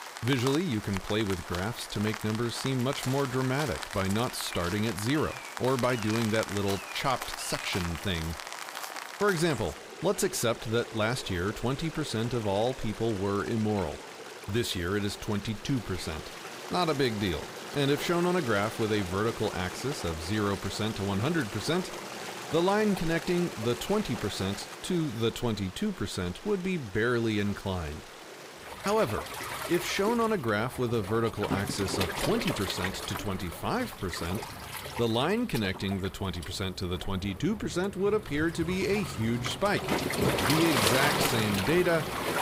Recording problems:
rain or running water; loud; throughout; 6 dB below the speech

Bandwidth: 15.5 kHz